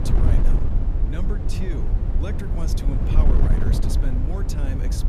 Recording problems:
wind noise on the microphone; heavy; 2 dB above the speech

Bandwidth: 14.5 kHz